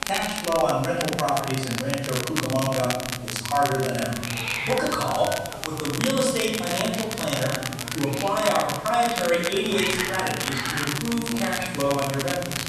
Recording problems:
off-mic speech; far
room echo; noticeable; dies away in 1.2 s
crackle, like an old record; loud; 5 dB below the speech
hiss; noticeable; throughout; 10 dB below the speech
electrical hum; faint; from 2 to 4.5 s, from 6.5 to 8.5 s and from 9.5 s on; 60 Hz, 25 dB below the speech
background chatter; faint; throughout; 4 voices, 30 dB below the speech

